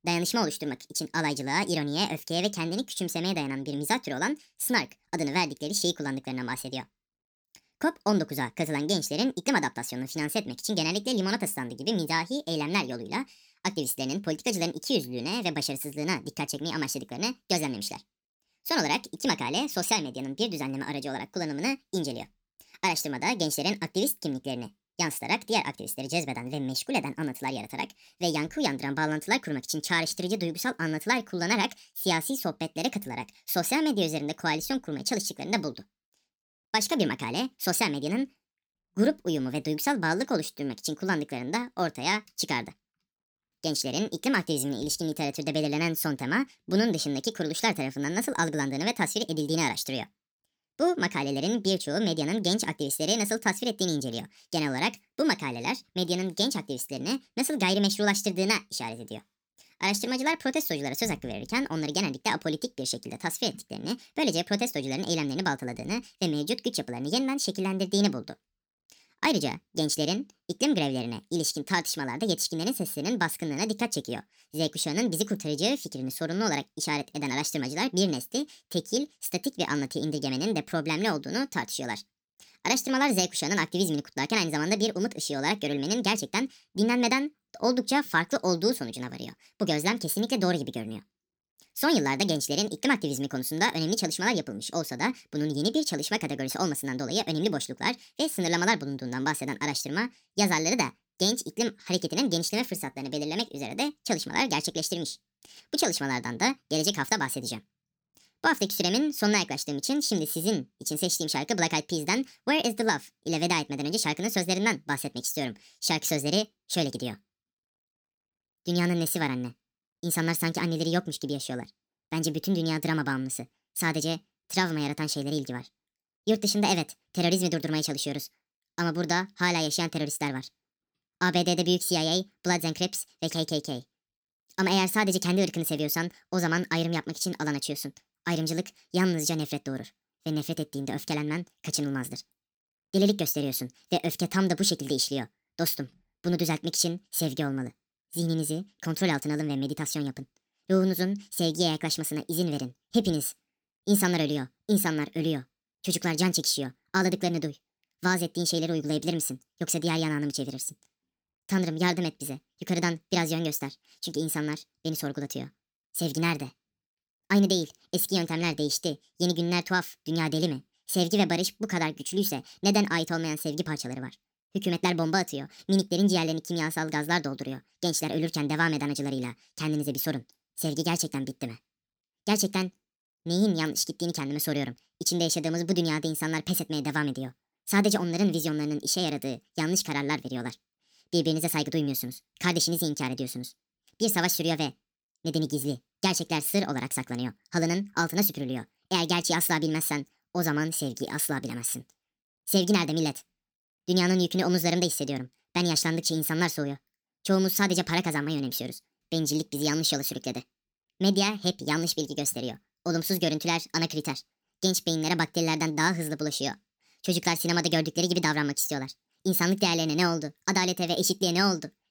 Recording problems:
wrong speed and pitch; too fast and too high; 1.5 times normal speed

